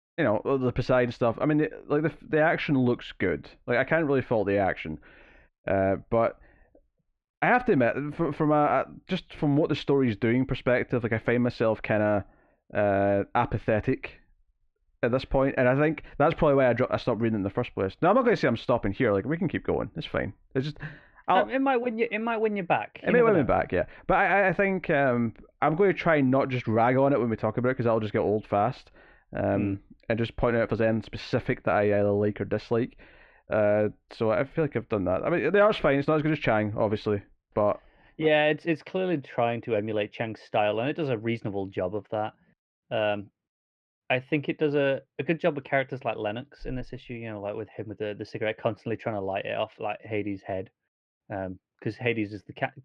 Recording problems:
muffled; very; fading above 2.5 kHz

